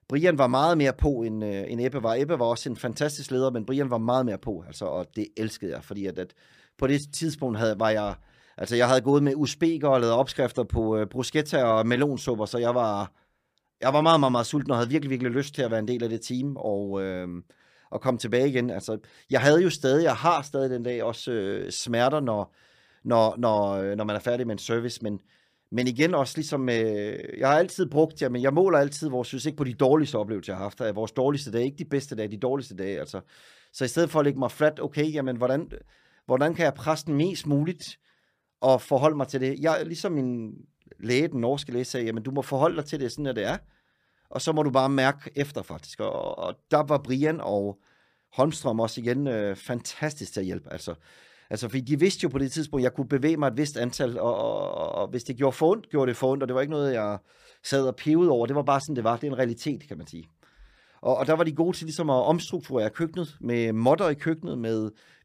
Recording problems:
none

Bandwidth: 15 kHz